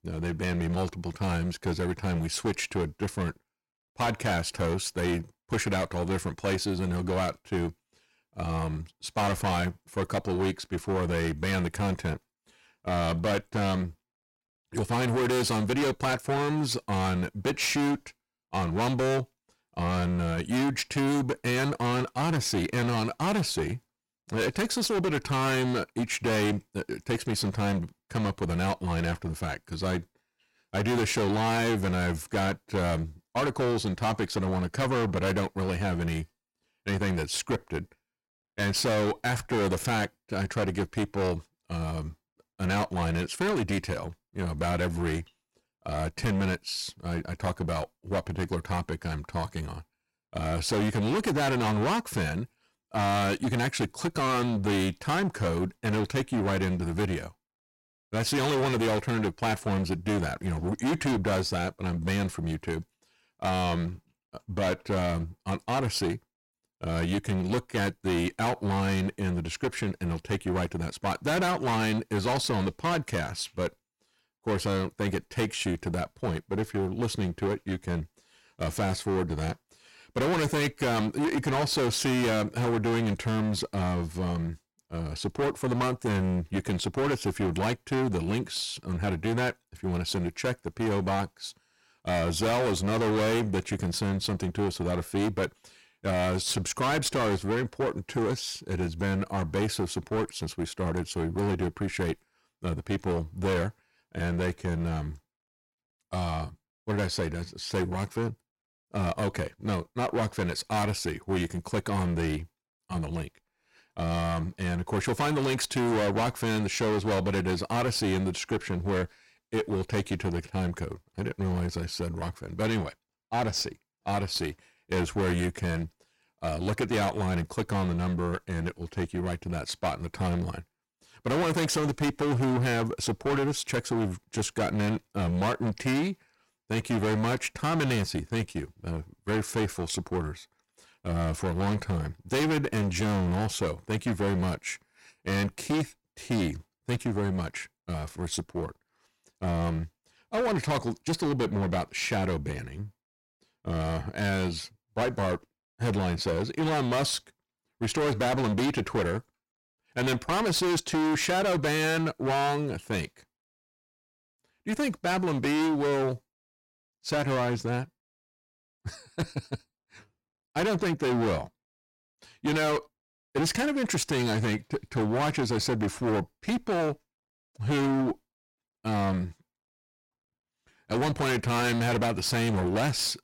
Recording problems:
distortion; heavy; 19% of the sound clipped

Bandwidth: 16.5 kHz